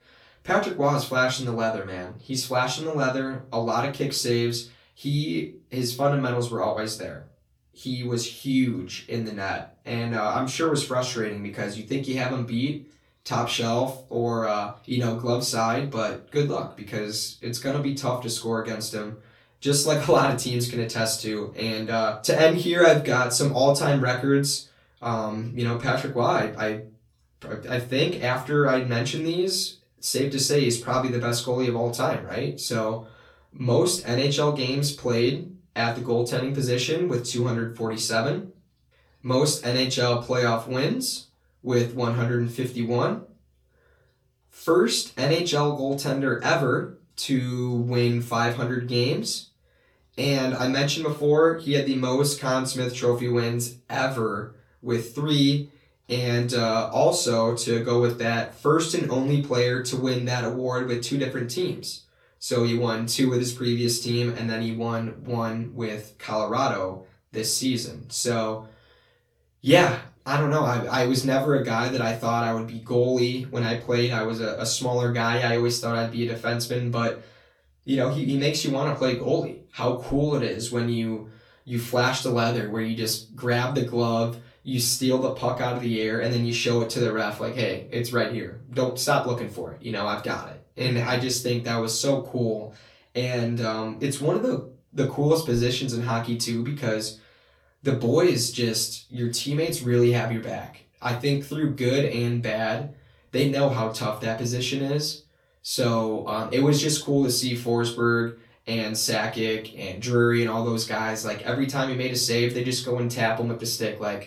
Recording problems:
off-mic speech; far
room echo; slight; dies away in 0.3 s

